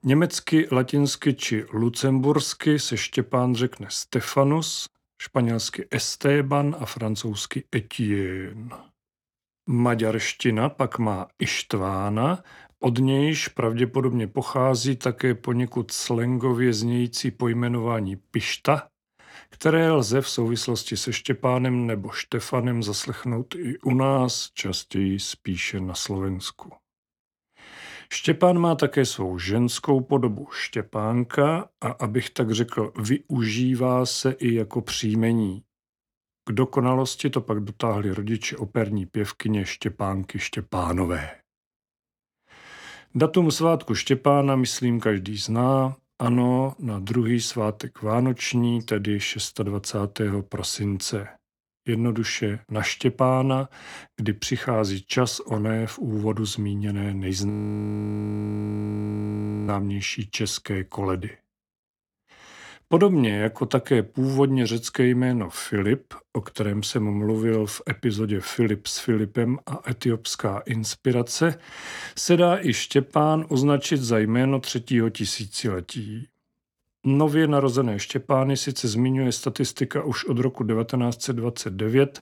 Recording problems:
audio freezing; at 58 s for 2 s

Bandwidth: 17 kHz